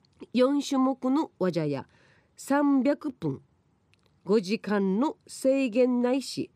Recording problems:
none

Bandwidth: 15.5 kHz